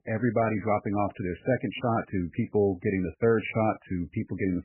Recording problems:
garbled, watery; badly; nothing above 2.5 kHz

